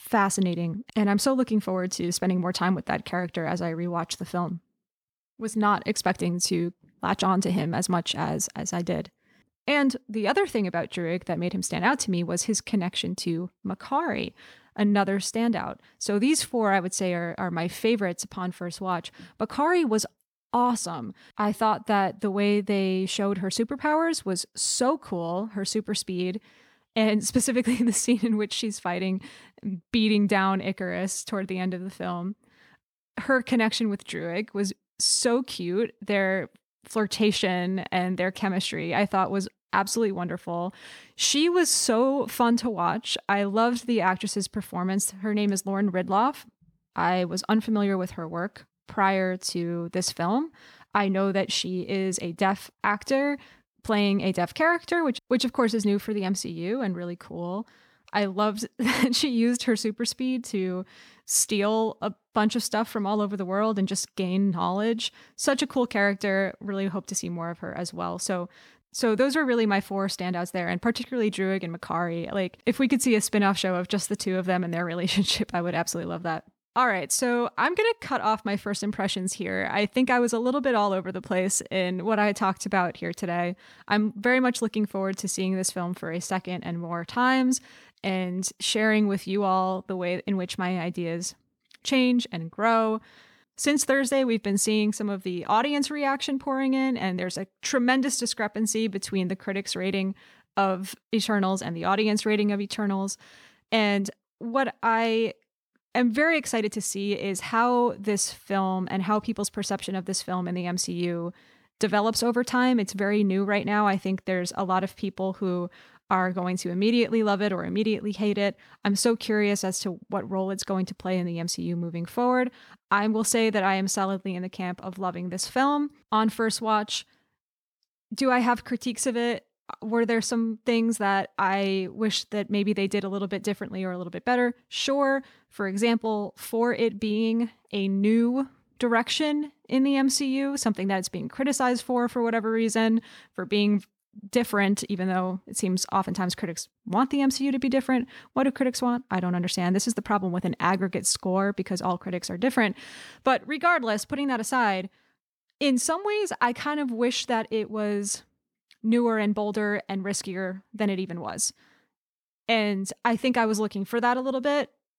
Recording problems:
none

